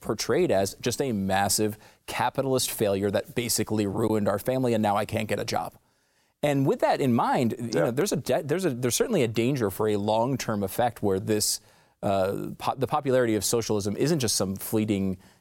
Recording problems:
none

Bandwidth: 16.5 kHz